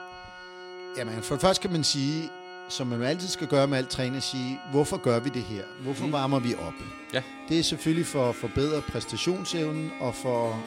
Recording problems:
background music; noticeable; throughout; 10 dB below the speech

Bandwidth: 16 kHz